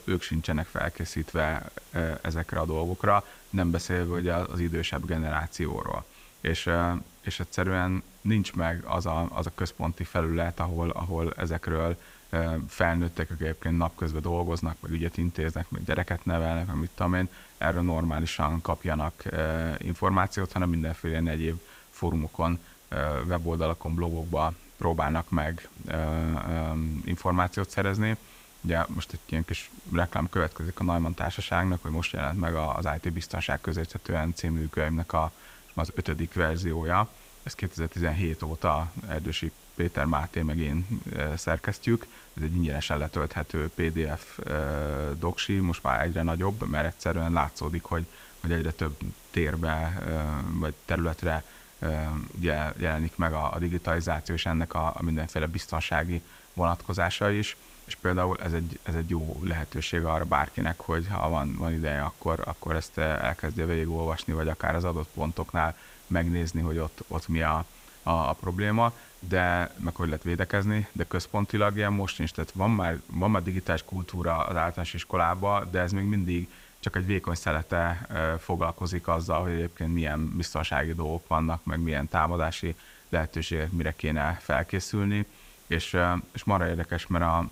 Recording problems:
hiss; faint; throughout; 25 dB below the speech

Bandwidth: 15.5 kHz